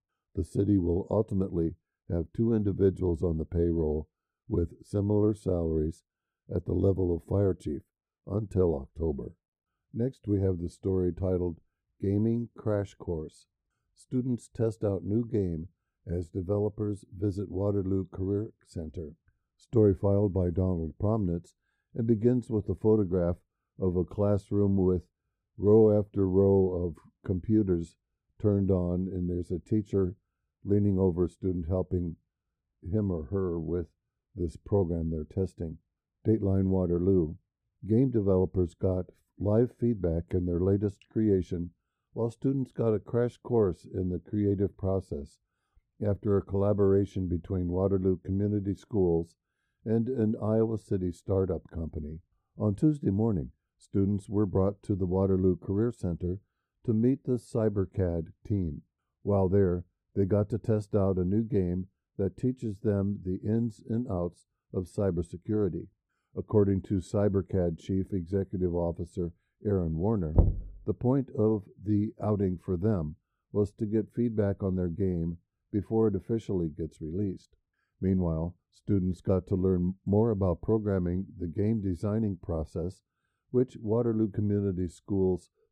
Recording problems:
muffled; very; fading above 1 kHz
door banging; loud; at 1:10; peak 2 dB above the speech

